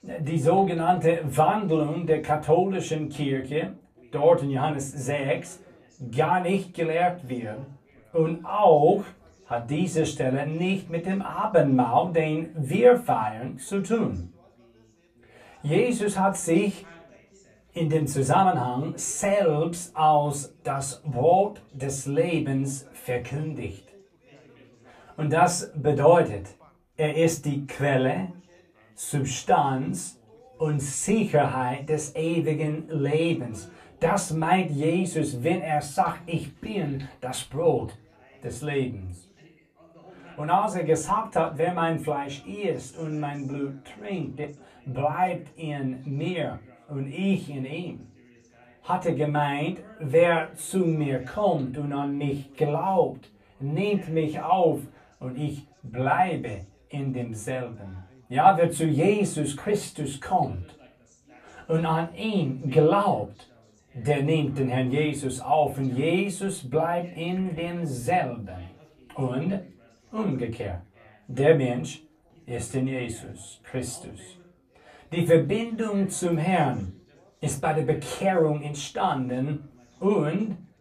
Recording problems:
off-mic speech; far
room echo; very slight; dies away in 0.2 s
background chatter; faint; throughout; 3 voices, 30 dB below the speech

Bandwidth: 14.5 kHz